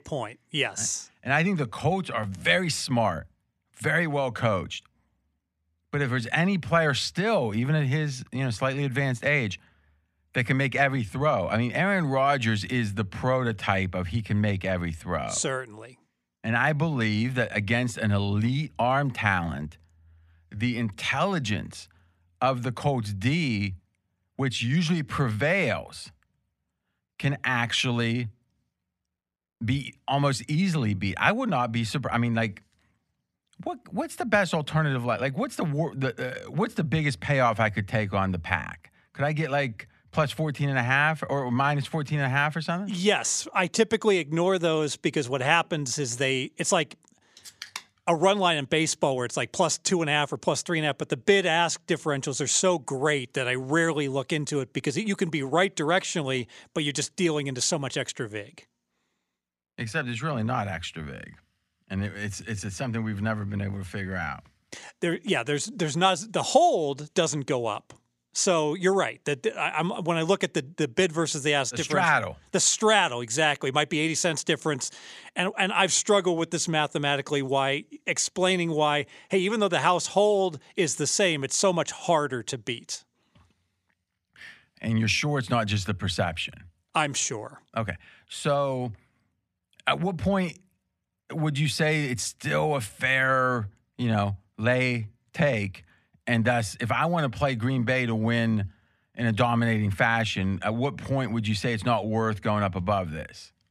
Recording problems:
none

